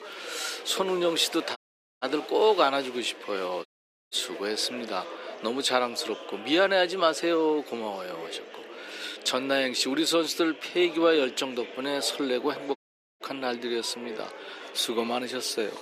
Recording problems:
thin; somewhat; fading below 300 Hz
murmuring crowd; noticeable; throughout; 15 dB below the speech
audio cutting out; at 1.5 s, at 3.5 s and at 13 s

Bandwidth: 14.5 kHz